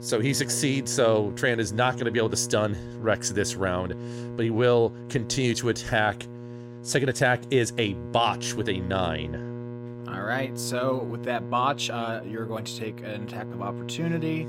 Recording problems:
electrical hum; noticeable; throughout; 60 Hz, 15 dB below the speech

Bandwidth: 16 kHz